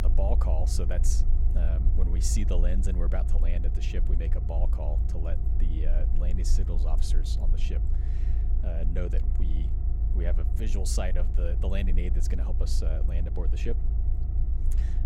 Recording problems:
low rumble; loud; throughout; 7 dB below the speech

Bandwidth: 16 kHz